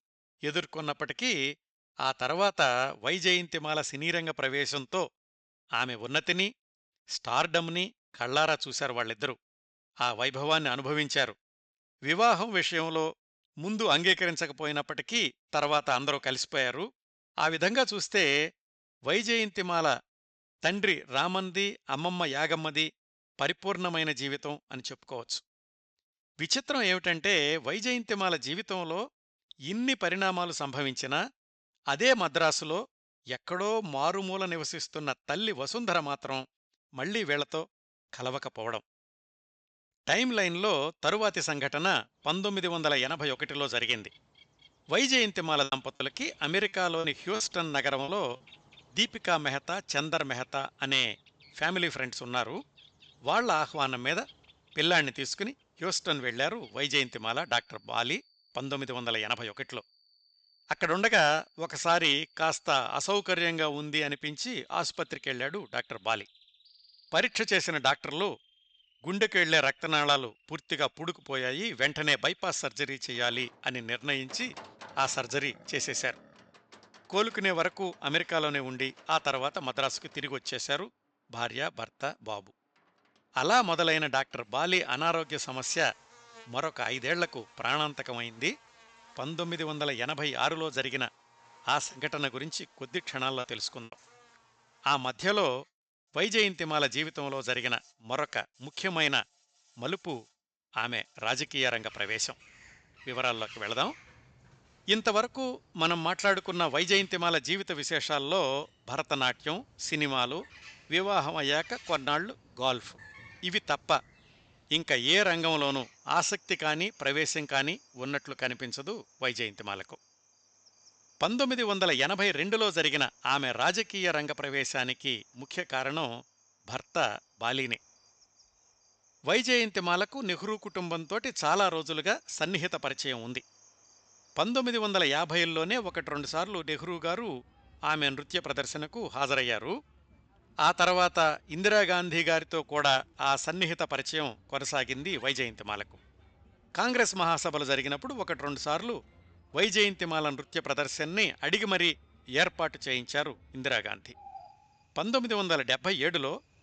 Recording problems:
high frequencies cut off; noticeable; nothing above 8 kHz
animal sounds; faint; from 42 s on; 30 dB below the speech
choppy; very; from 46 to 48 s; 9% of the speech affected

